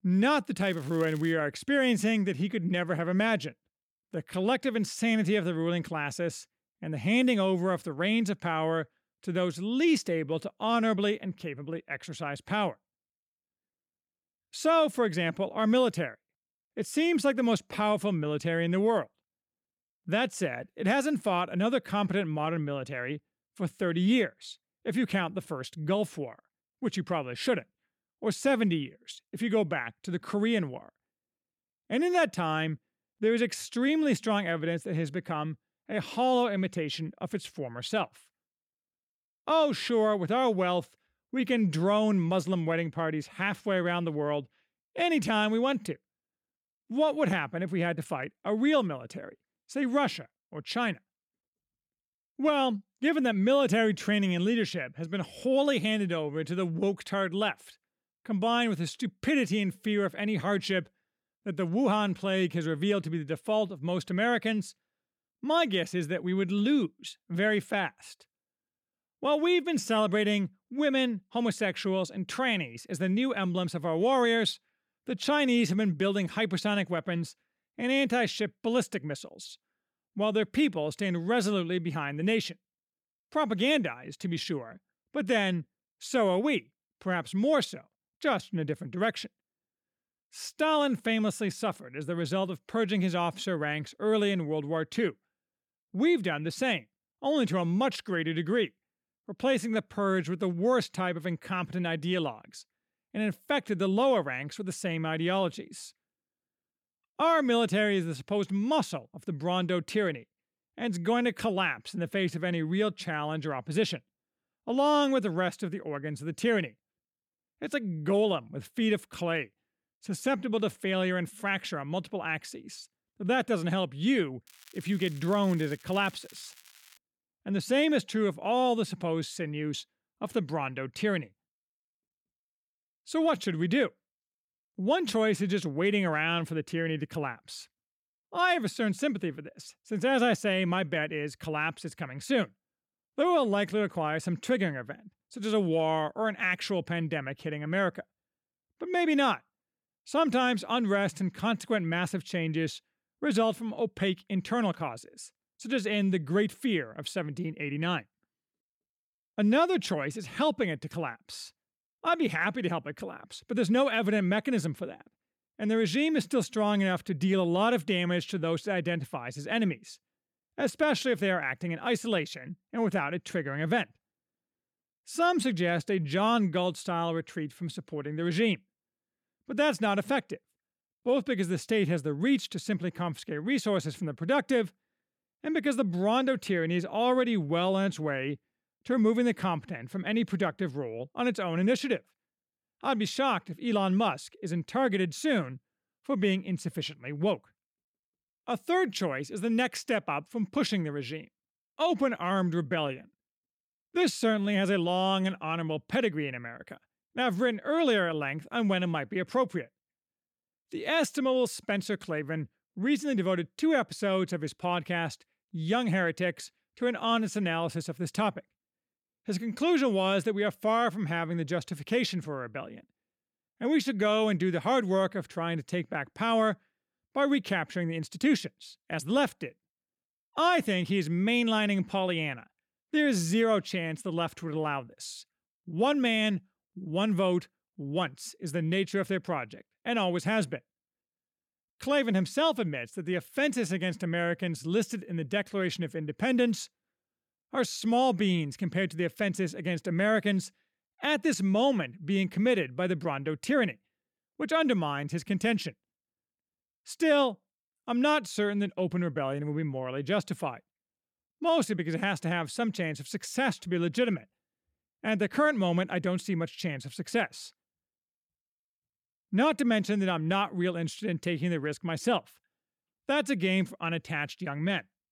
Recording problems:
crackling; faint; at 0.5 s and from 2:04 to 2:07; 25 dB below the speech

